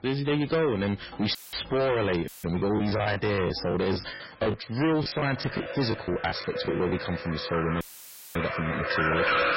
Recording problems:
distortion; heavy; 16% of the sound clipped
garbled, watery; badly; nothing above 5.5 kHz
rain or running water; loud; throughout; 4 dB below the speech
audio cutting out; filled with static; at 1.5 s, at 2.5 s and at 8 s for 0.5 s
choppy; very; from 2.5 to 7 s; 14% of the speech affected

